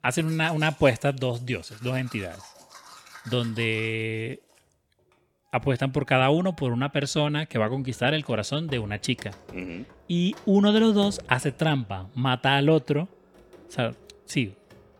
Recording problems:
household noises; faint; throughout; 25 dB below the speech

